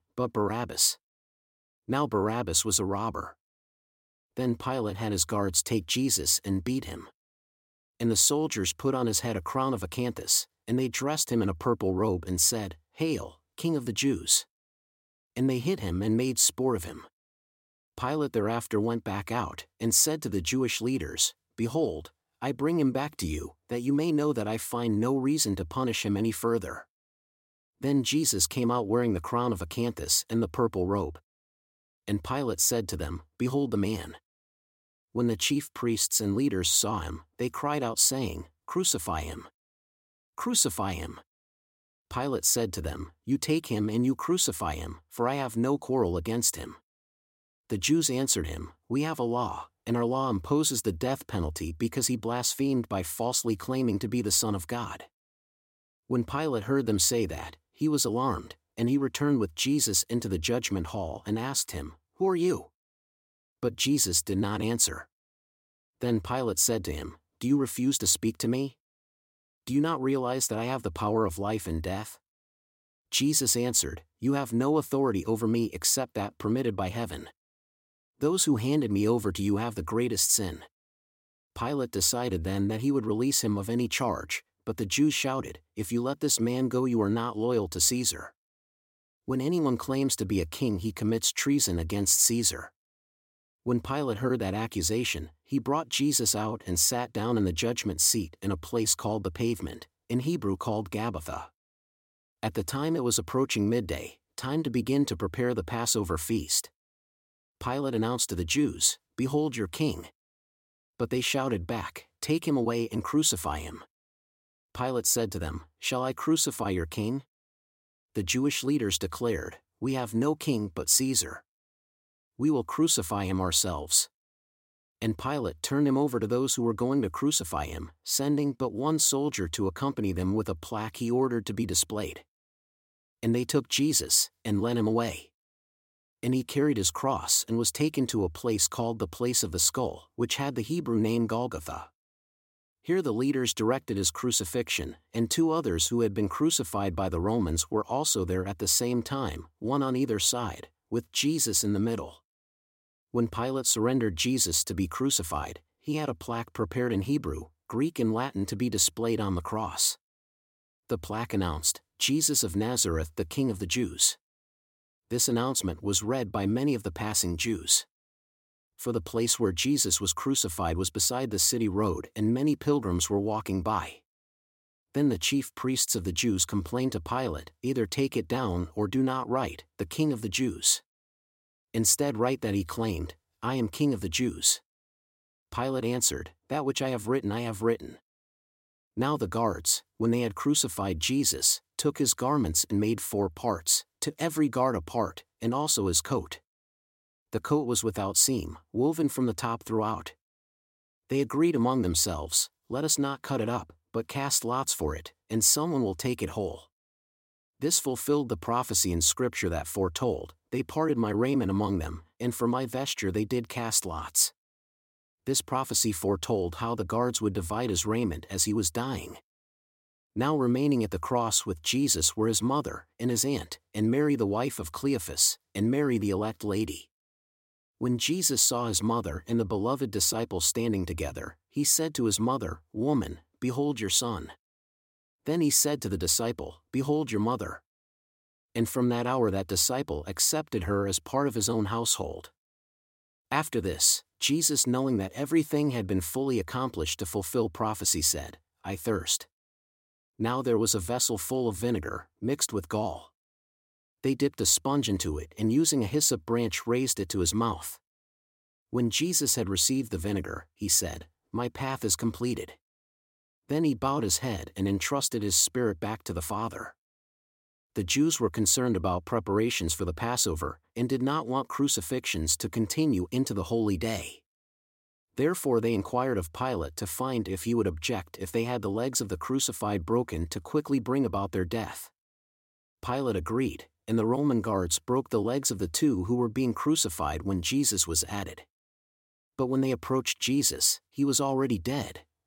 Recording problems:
none

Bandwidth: 16.5 kHz